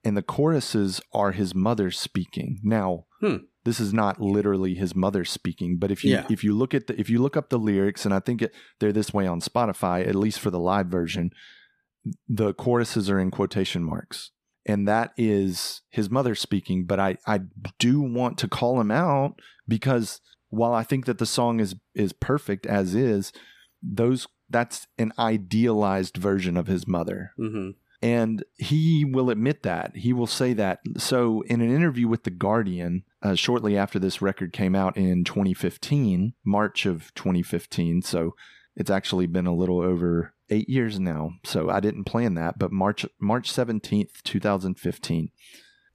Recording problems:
none

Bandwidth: 14.5 kHz